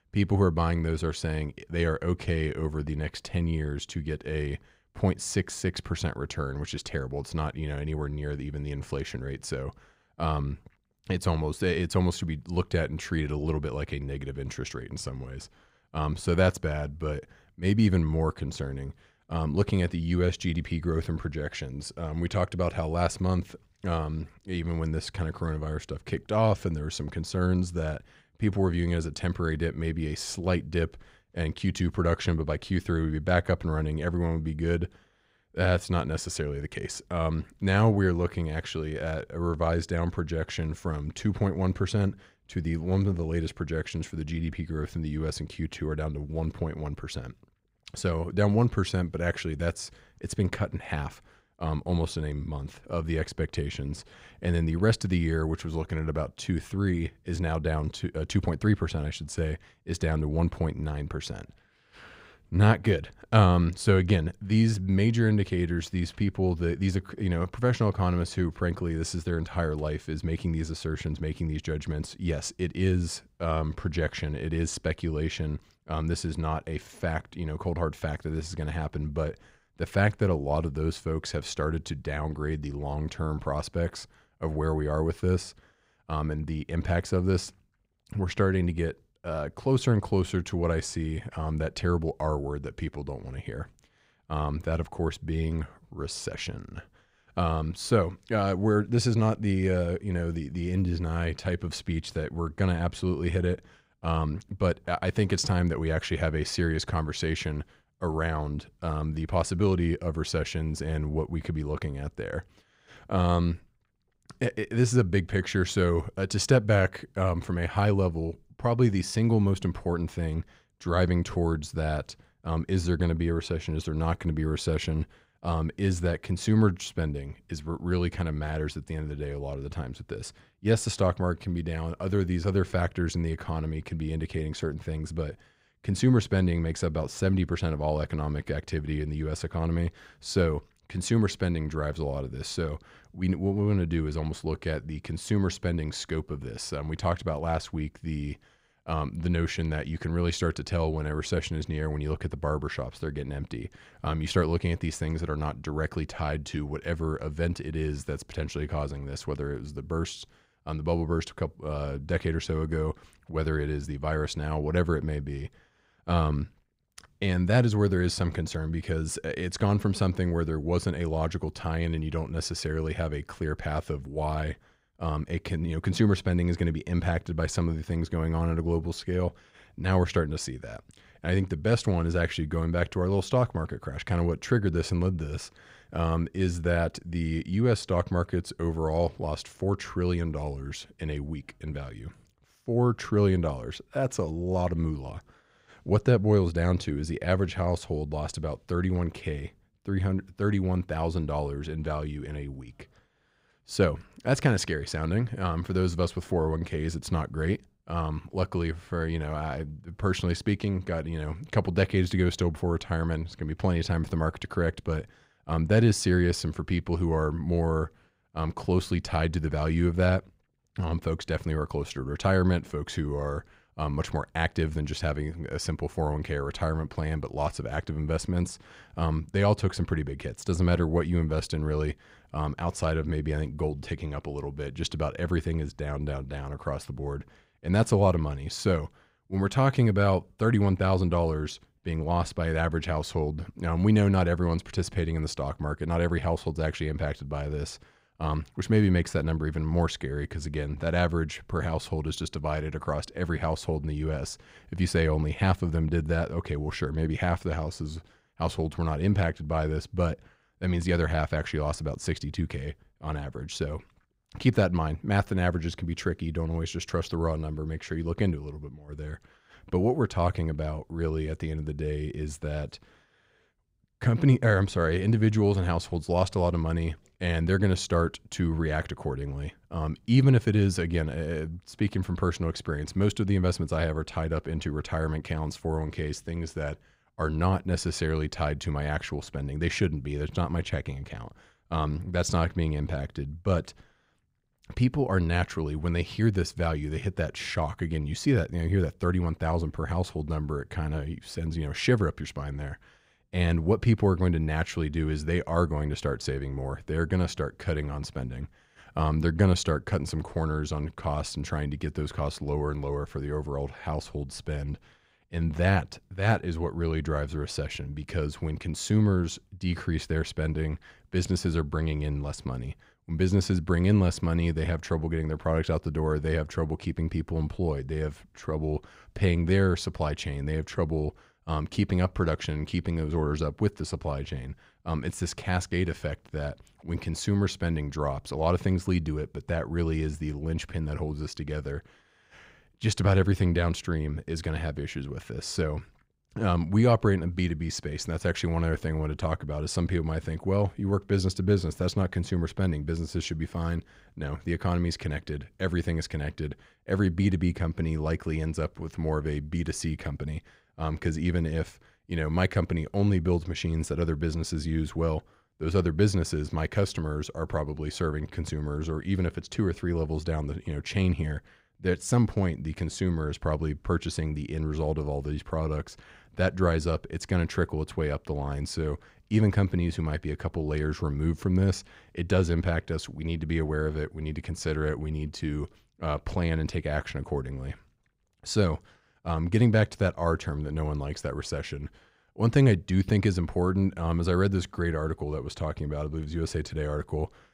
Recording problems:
none

